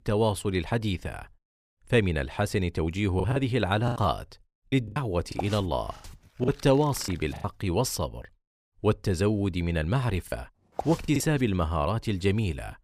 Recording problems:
choppy; very; from 3 to 7.5 s and at 10 s; 13% of the speech affected

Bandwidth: 15 kHz